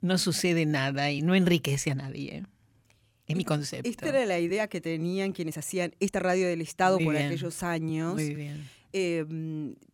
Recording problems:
uneven, jittery; strongly; from 1 to 9 s

